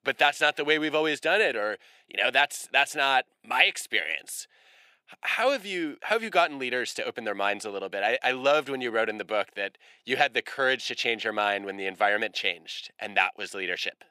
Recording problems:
thin; somewhat; fading below 350 Hz

